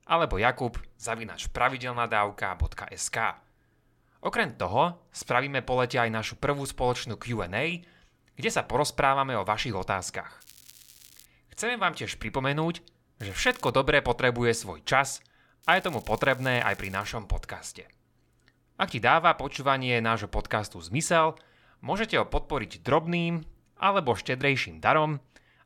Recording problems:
crackling; faint; at 10 s, at 13 s and from 16 to 17 s; 25 dB below the speech

